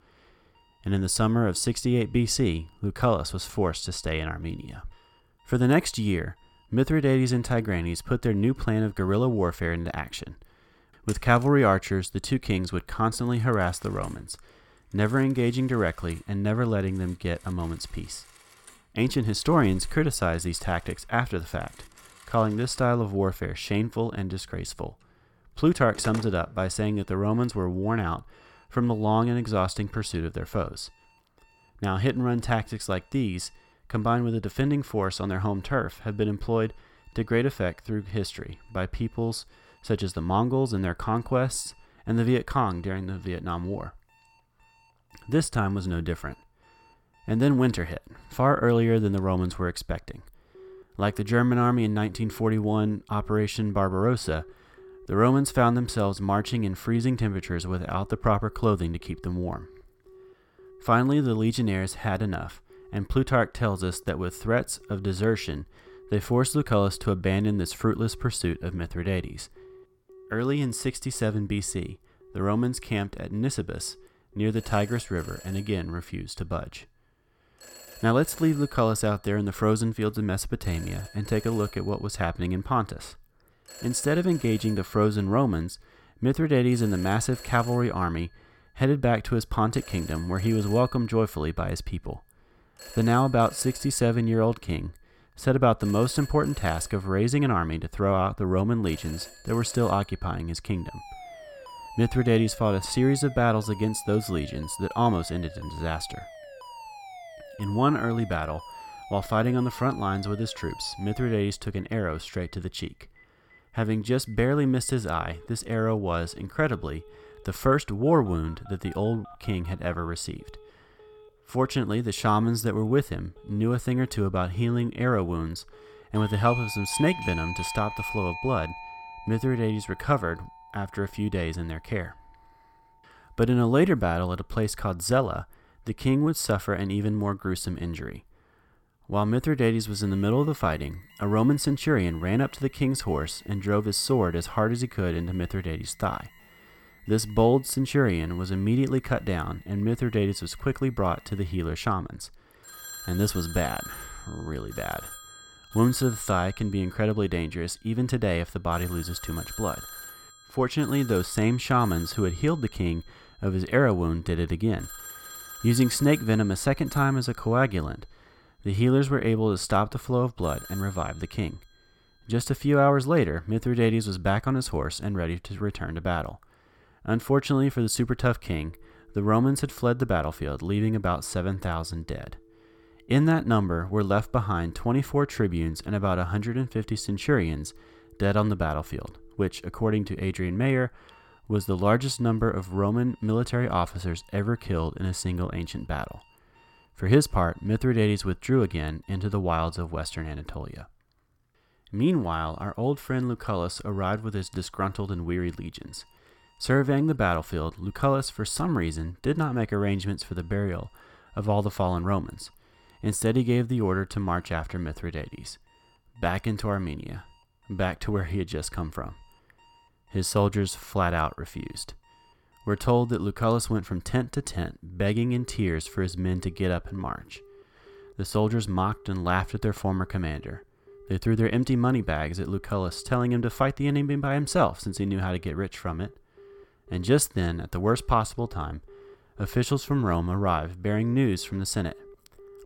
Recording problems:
alarms or sirens; noticeable; throughout; 20 dB below the speech

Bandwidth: 17 kHz